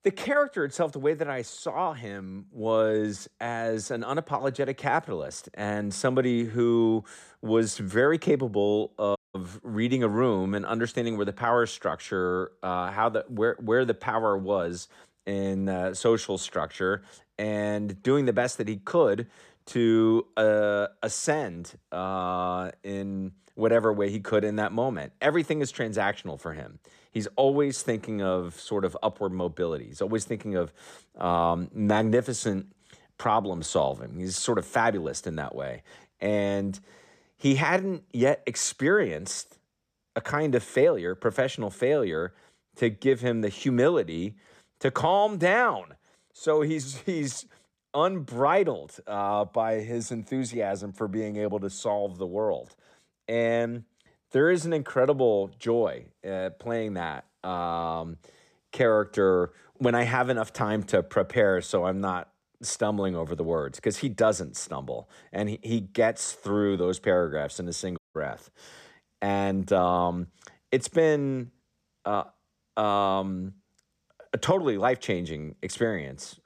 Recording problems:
audio cutting out; at 9 s and at 1:08

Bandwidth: 14 kHz